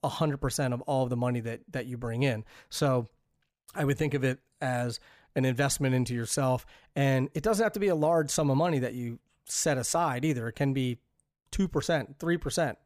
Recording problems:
none

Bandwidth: 15 kHz